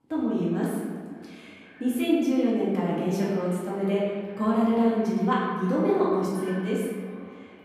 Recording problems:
off-mic speech; far
room echo; noticeable; dies away in 1.6 s
echo of what is said; faint; throughout; 530 ms later, 25 dB below the speech

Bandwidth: 14.5 kHz